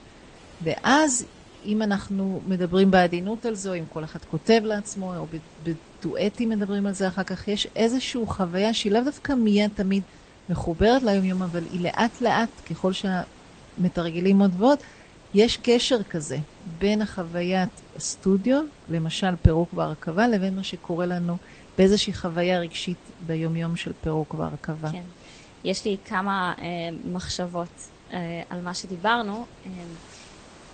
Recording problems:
garbled, watery; slightly; nothing above 8.5 kHz
hiss; faint; throughout; 20 dB below the speech

